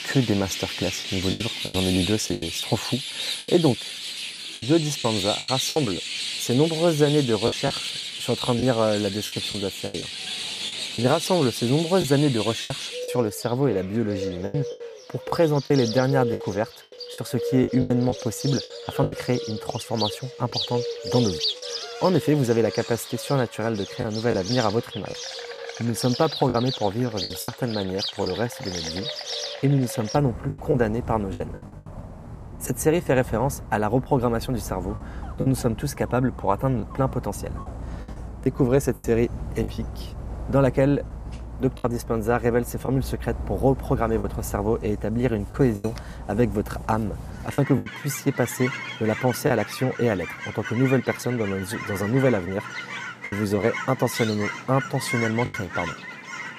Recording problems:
animal sounds; loud; throughout; 7 dB below the speech
choppy; very; 5% of the speech affected

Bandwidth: 14.5 kHz